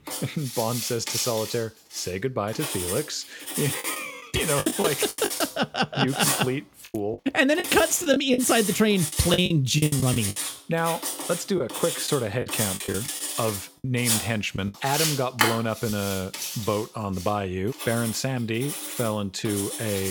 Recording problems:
household noises; loud; throughout; 3 dB below the speech
choppy; very; from 4 to 5.5 s, from 7 to 10 s and from 12 to 15 s; 13% of the speech affected
abrupt cut into speech; at the end

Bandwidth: 18 kHz